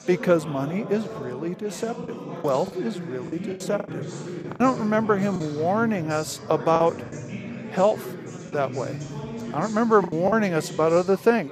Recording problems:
chatter from many people; noticeable; throughout; 10 dB below the speech
choppy; very; 6% of the speech affected

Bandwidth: 14.5 kHz